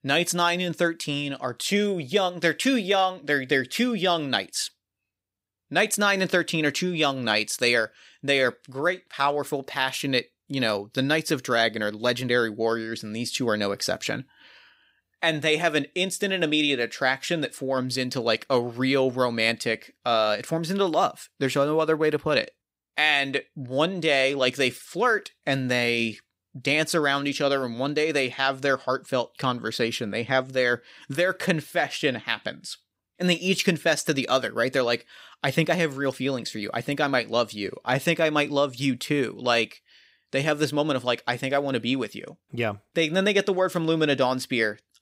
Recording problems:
none

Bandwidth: 15.5 kHz